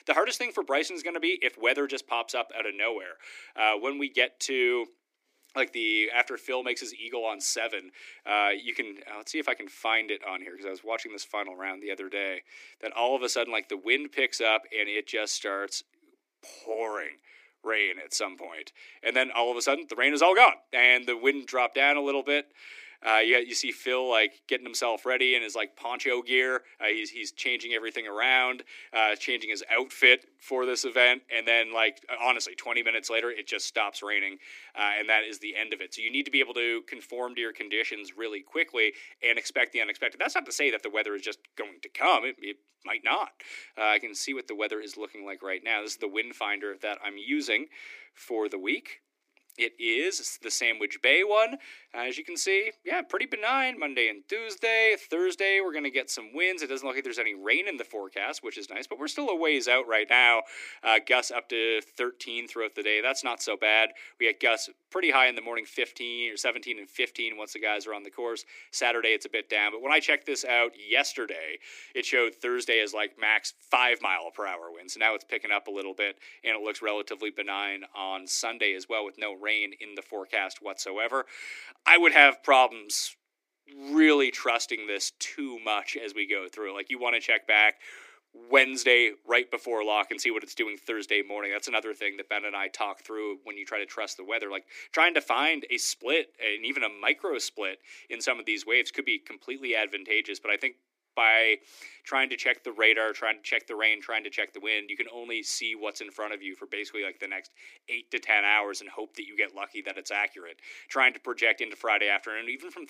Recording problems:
thin; somewhat; fading below 300 Hz

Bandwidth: 15 kHz